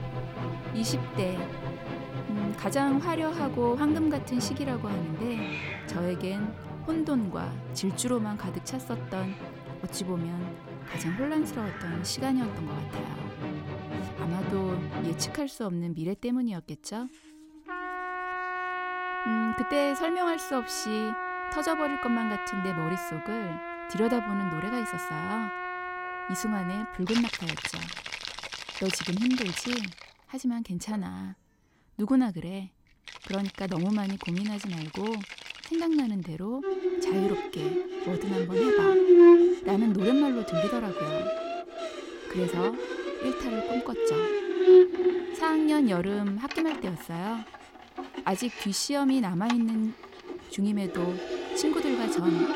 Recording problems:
background music; very loud; throughout; 1 dB above the speech
animal sounds; noticeable; throughout; 20 dB below the speech

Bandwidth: 16.5 kHz